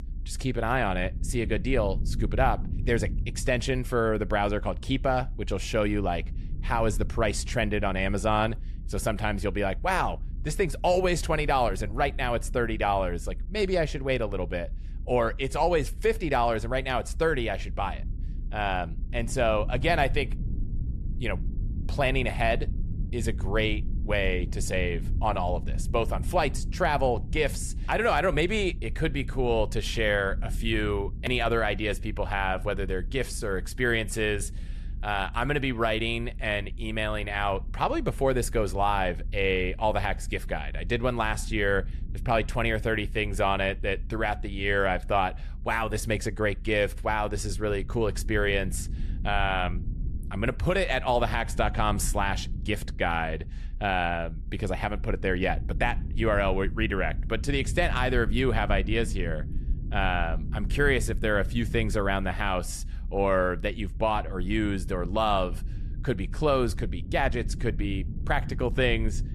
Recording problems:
low rumble; faint; throughout; 25 dB below the speech

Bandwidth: 13.5 kHz